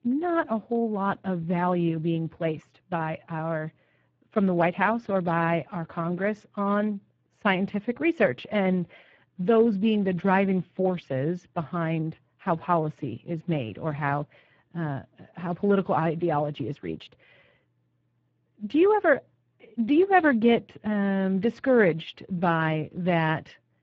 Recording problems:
garbled, watery; badly
muffled; very; fading above 3 kHz

